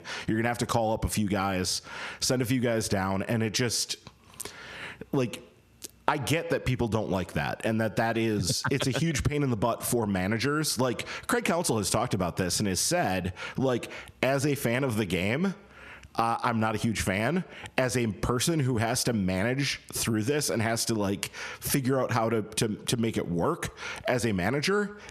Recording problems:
squashed, flat; heavily

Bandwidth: 14.5 kHz